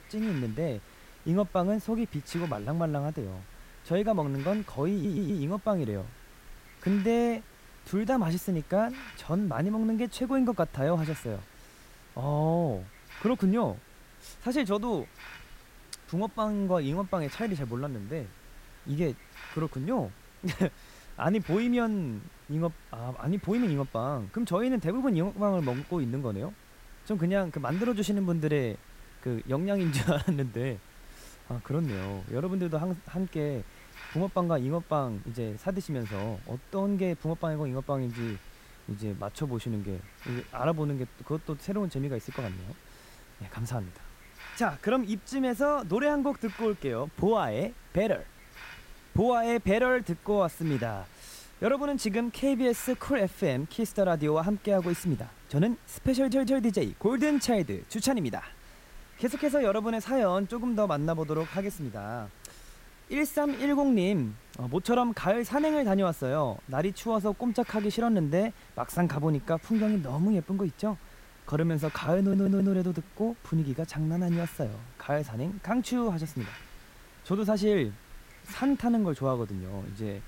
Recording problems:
hiss; faint; throughout; 20 dB below the speech
audio stuttering; at 5 s, at 56 s and at 1:12

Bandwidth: 16 kHz